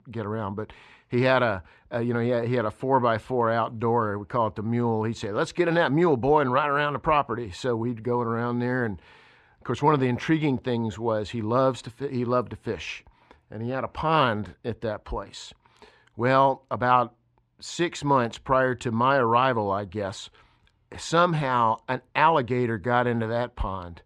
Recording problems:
muffled; slightly; fading above 3 kHz

